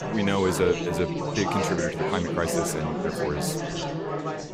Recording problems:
chatter from many people; loud; throughout; 1 dB below the speech

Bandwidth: 15.5 kHz